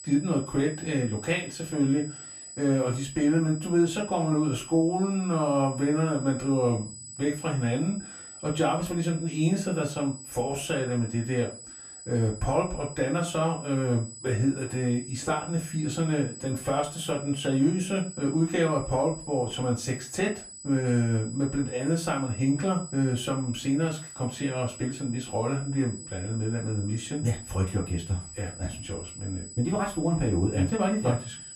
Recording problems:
off-mic speech; far
room echo; very slight; dies away in 0.3 s
high-pitched whine; noticeable; throughout; 8 kHz, 15 dB below the speech

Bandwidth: 14.5 kHz